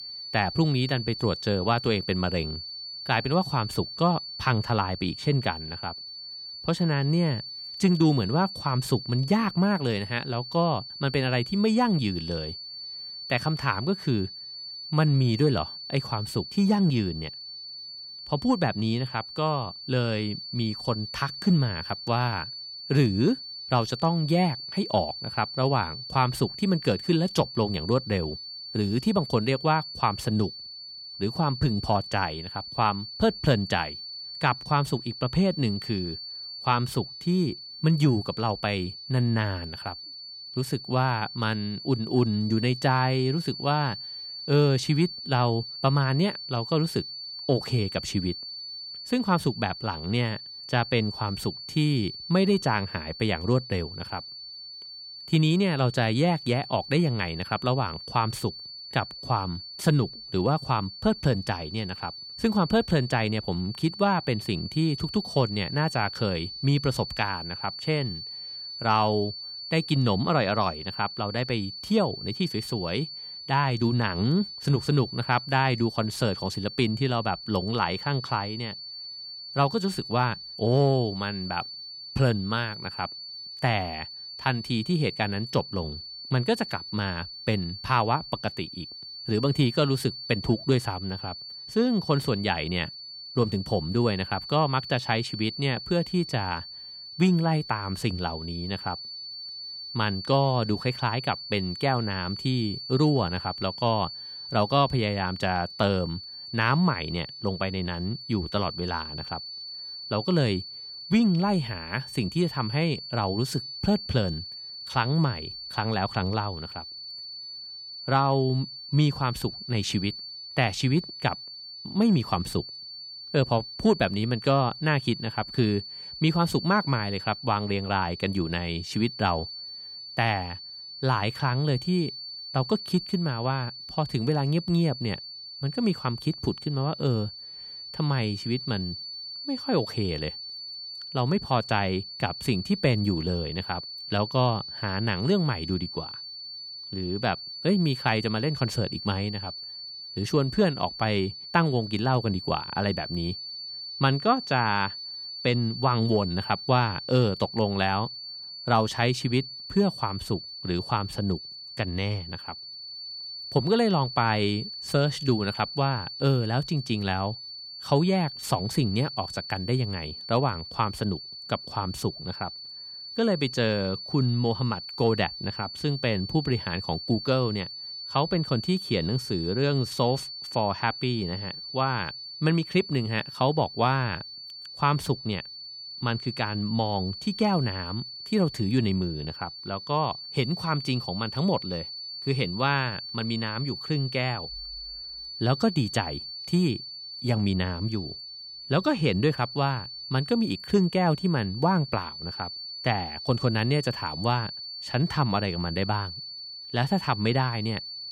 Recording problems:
high-pitched whine; loud; throughout; 4.5 kHz, 9 dB below the speech

